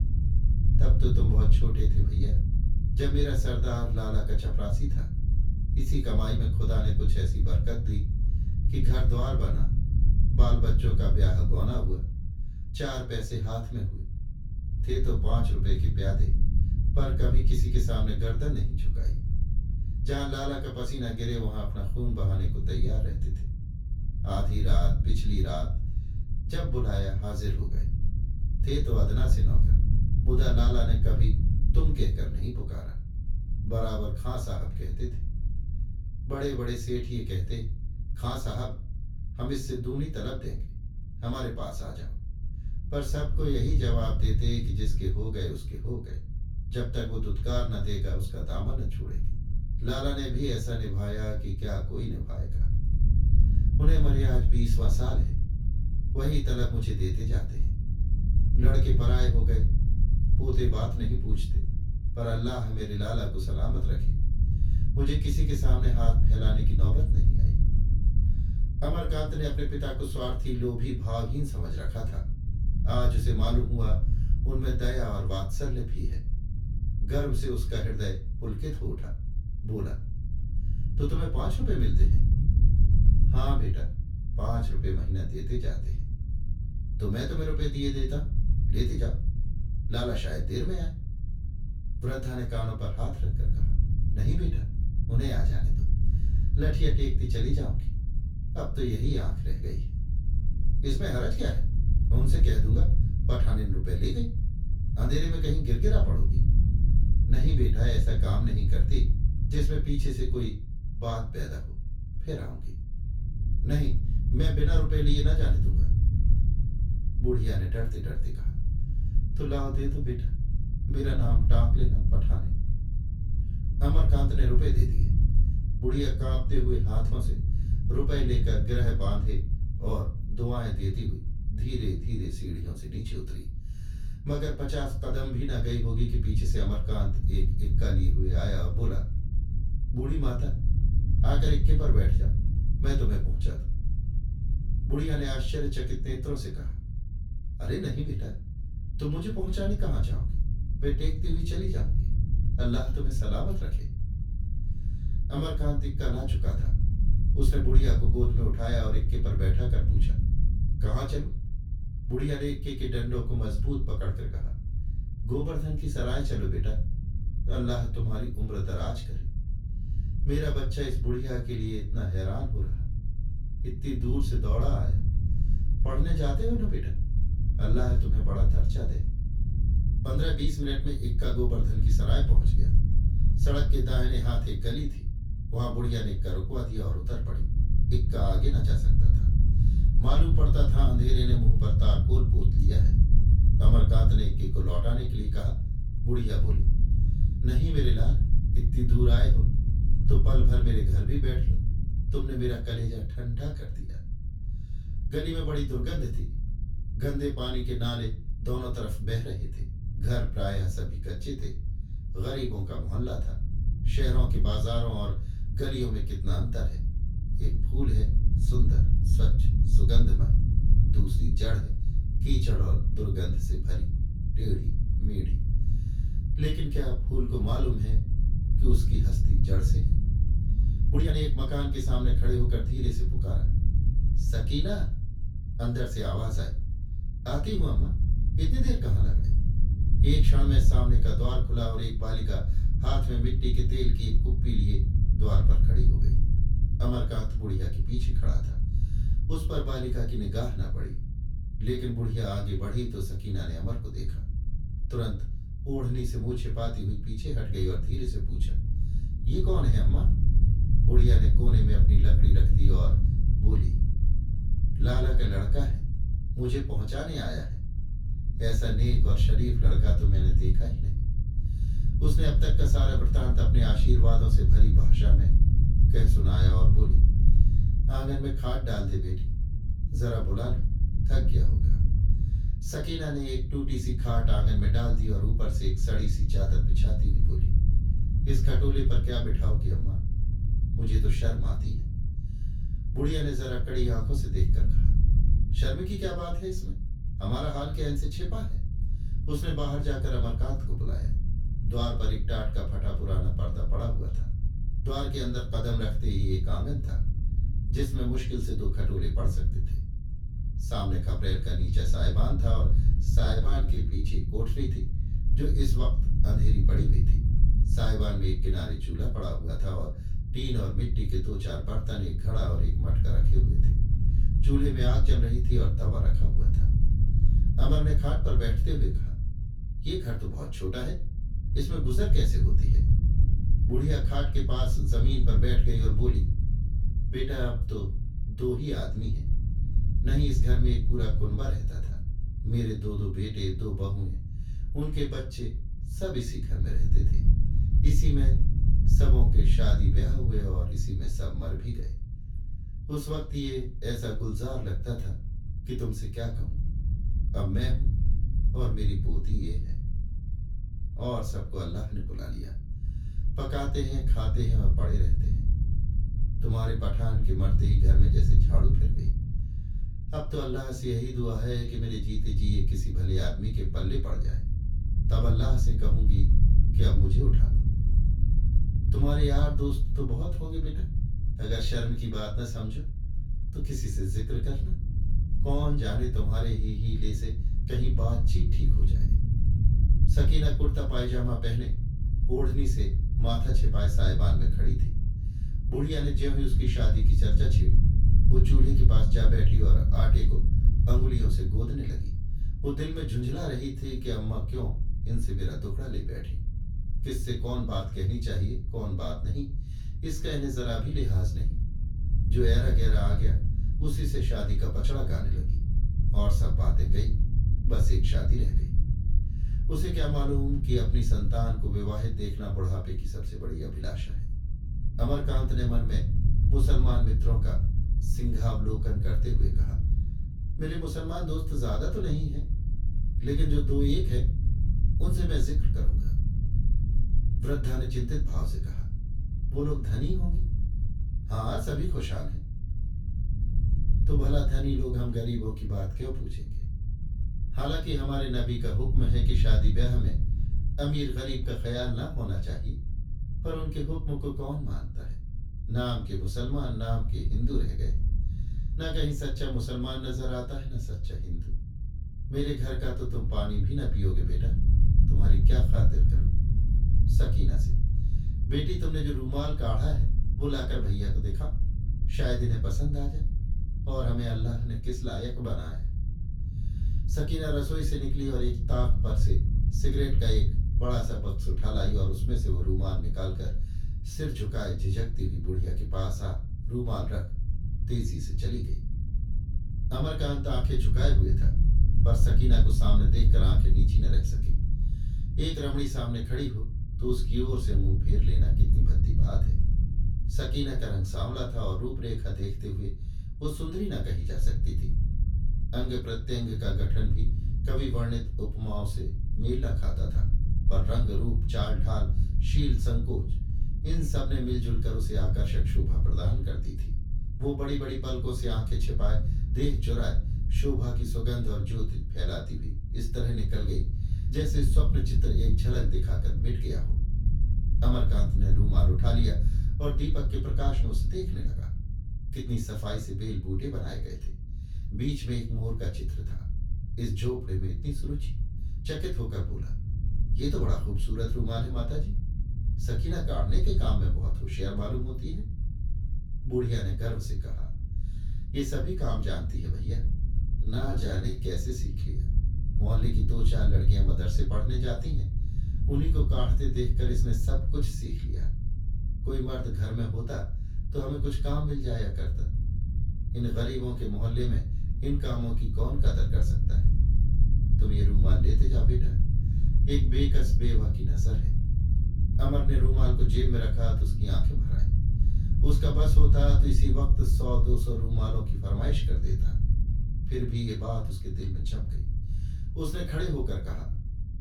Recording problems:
off-mic speech; far
room echo; slight; dies away in 0.3 s
low rumble; loud; throughout; 8 dB below the speech
uneven, jittery; strongly; from 2:01 to 9:11

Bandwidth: 17 kHz